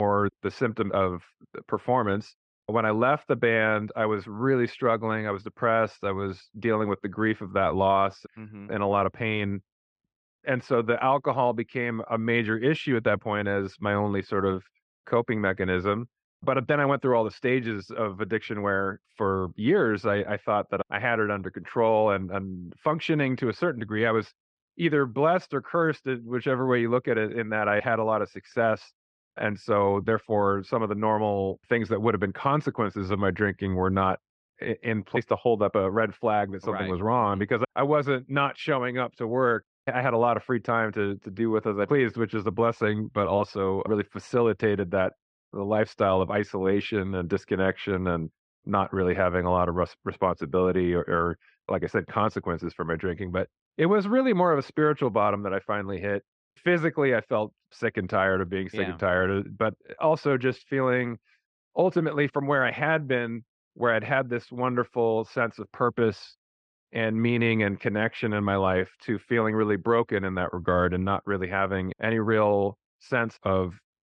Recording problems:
muffled; slightly; fading above 3.5 kHz
abrupt cut into speech; at the start

